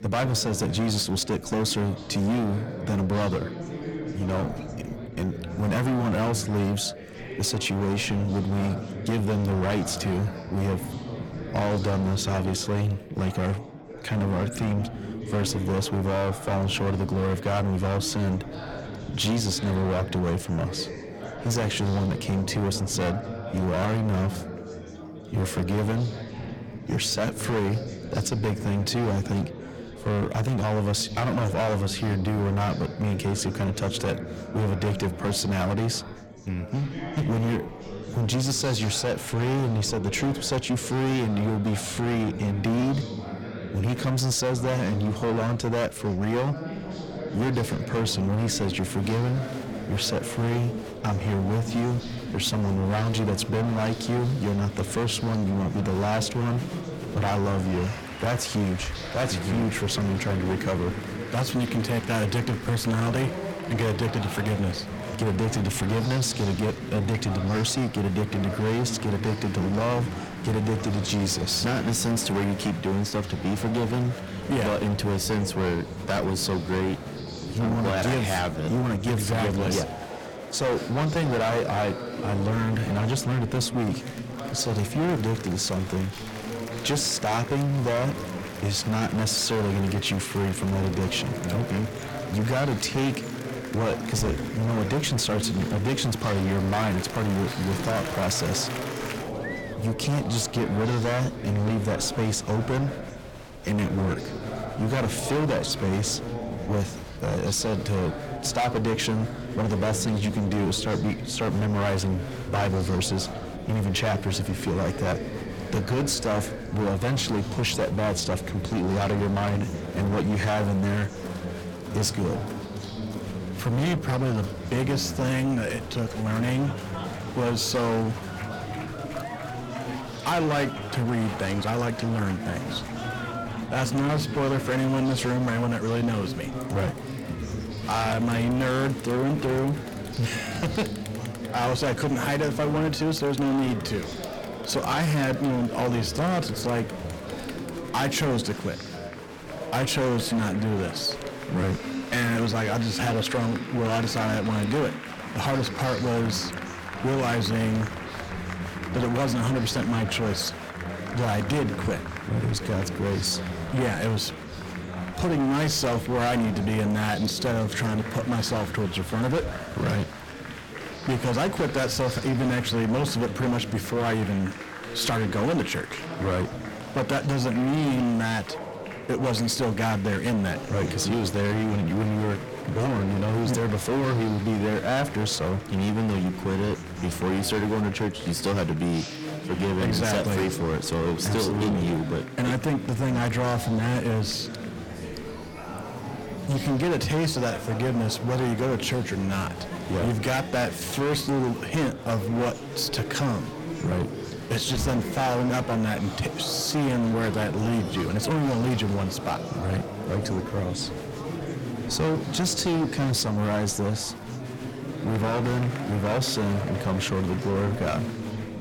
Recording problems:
distortion; heavy; 20% of the sound clipped
chatter from many people; loud; throughout; 9 dB below the speech

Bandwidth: 17.5 kHz